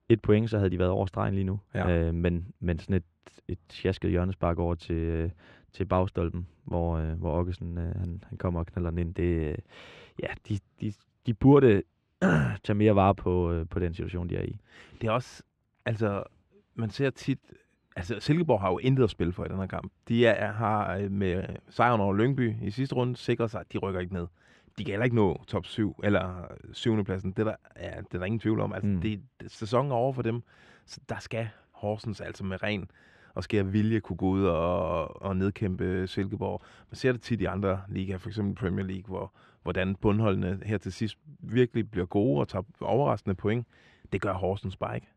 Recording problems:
muffled; slightly; fading above 2.5 kHz

